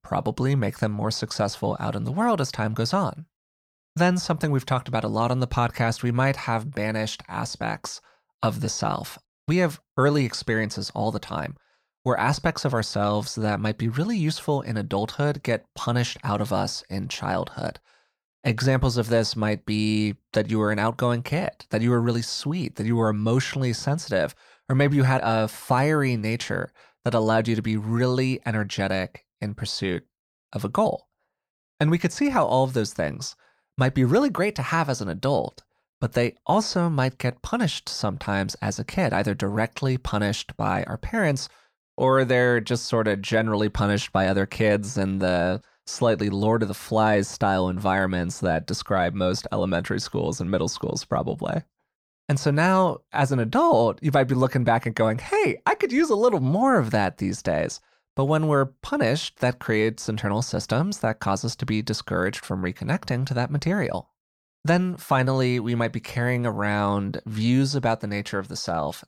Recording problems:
none

